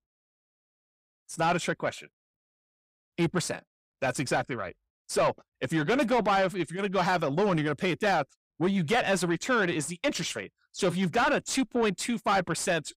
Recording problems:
distortion; slight; 10 dB below the speech

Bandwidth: 15.5 kHz